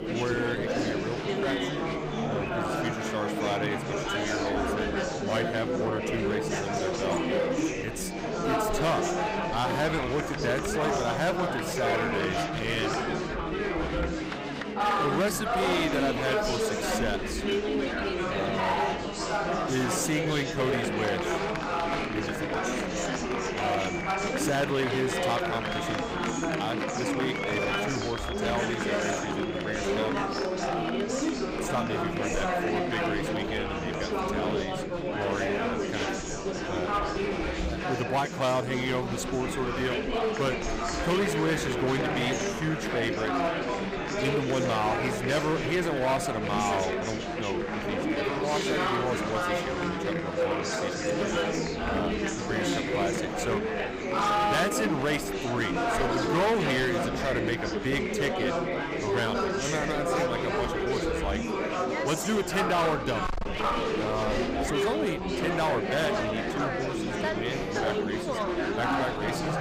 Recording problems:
distortion; slight; 8% of the sound clipped
chatter from many people; very loud; throughout; 2 dB above the speech

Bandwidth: 15.5 kHz